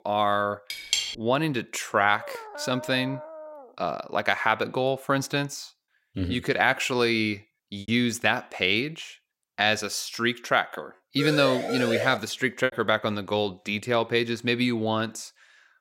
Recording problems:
choppy; occasionally; 1% of the speech affected
clattering dishes; noticeable; at 0.5 s; peak level with the speech
dog barking; faint; from 2 to 3.5 s; peak 10 dB below the speech
siren; noticeable; at 11 s; peak 2 dB below the speech

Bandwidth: 16 kHz